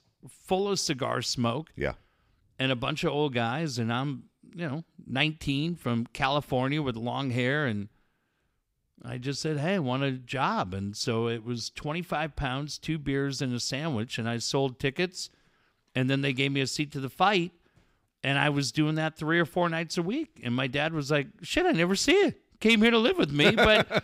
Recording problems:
none

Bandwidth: 15.5 kHz